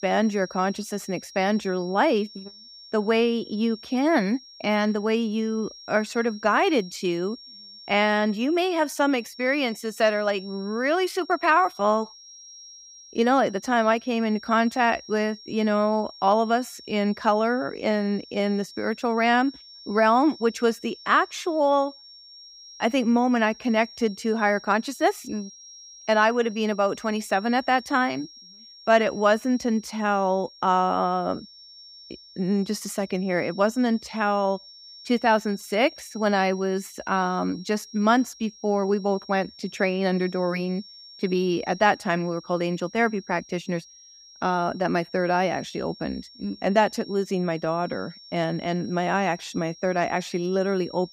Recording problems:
high-pitched whine; noticeable; throughout; 5.5 kHz, 20 dB below the speech

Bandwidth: 15.5 kHz